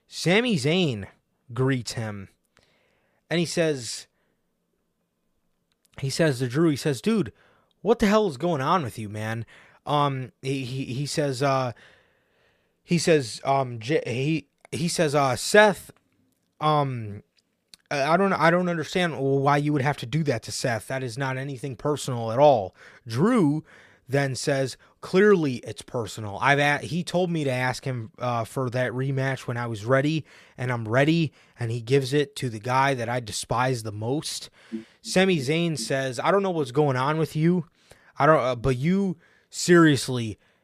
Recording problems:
none

